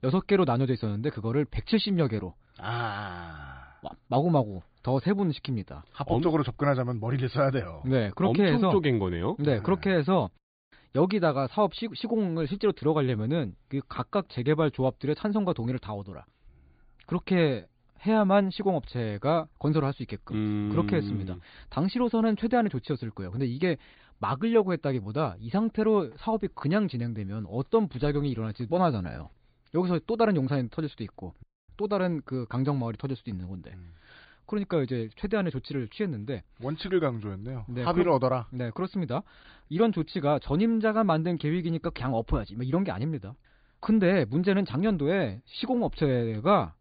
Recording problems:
high frequencies cut off; severe; nothing above 4.5 kHz

